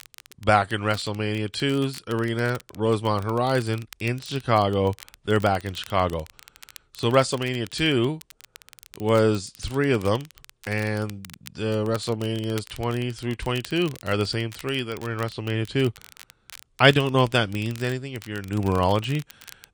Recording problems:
garbled, watery; slightly; nothing above 8.5 kHz
crackle, like an old record; faint; 20 dB below the speech

